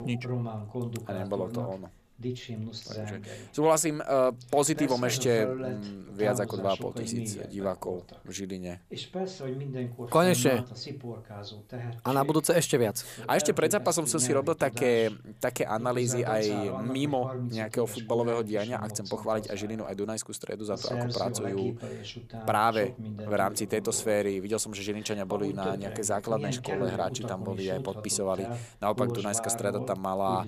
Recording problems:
voice in the background; loud; throughout; 8 dB below the speech

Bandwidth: 14.5 kHz